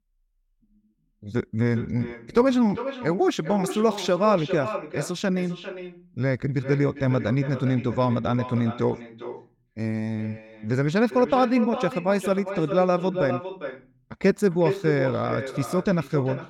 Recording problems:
echo of what is said; strong; throughout; 400 ms later, 10 dB below the speech

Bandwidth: 17.5 kHz